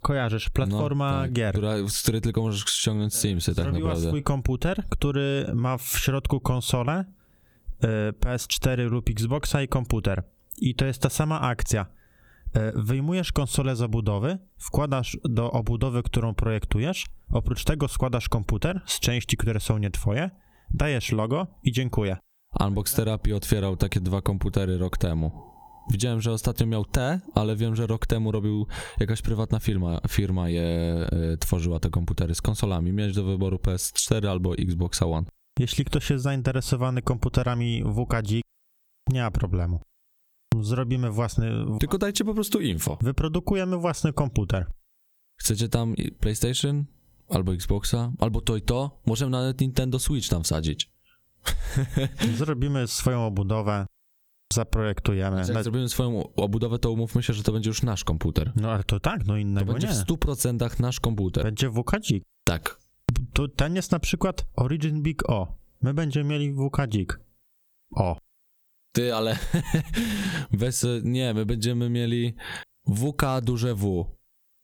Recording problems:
squashed, flat; somewhat

